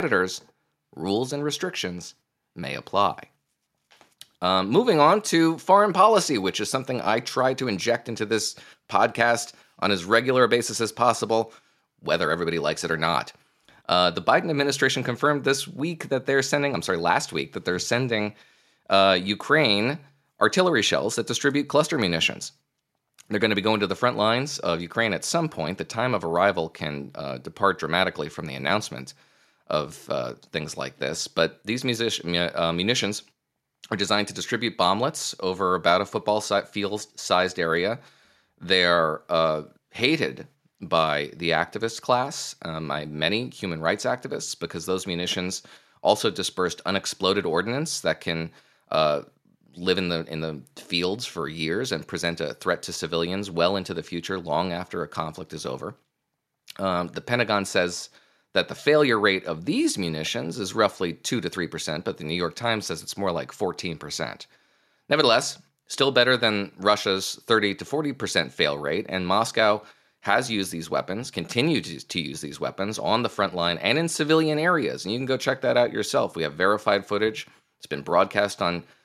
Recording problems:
abrupt cut into speech; at the start

